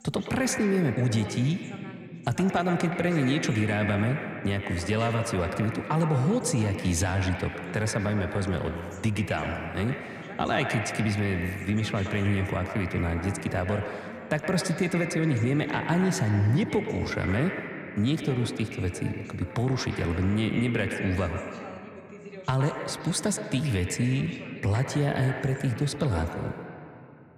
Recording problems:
echo of what is said; strong; throughout; 120 ms later, 7 dB below the speech
voice in the background; noticeable; throughout; 20 dB below the speech

